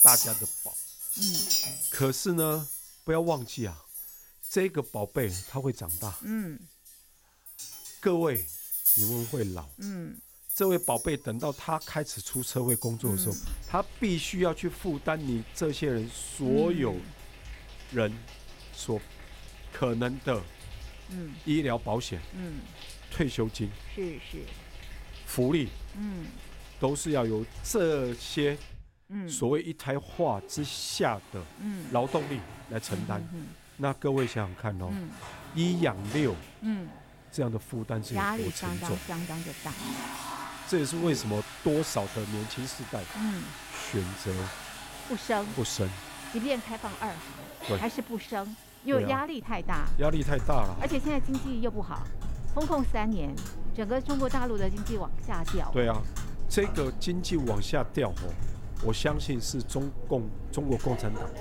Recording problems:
household noises; loud; throughout; 3 dB below the speech

